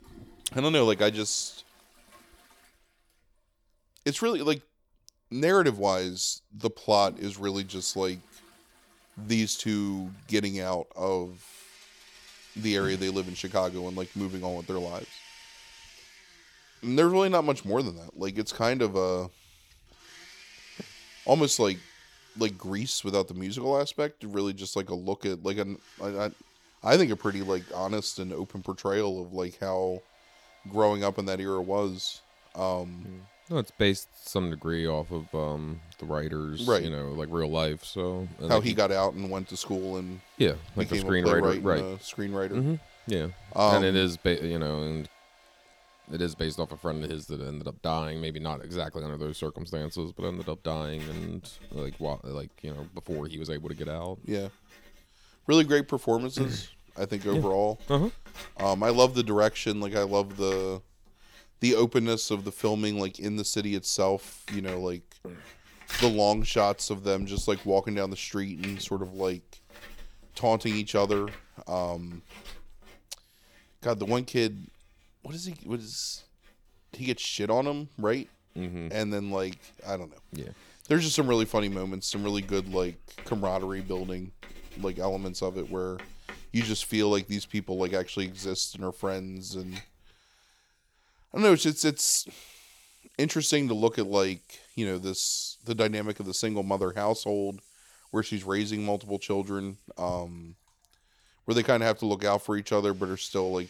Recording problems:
household noises; faint; throughout; 20 dB below the speech

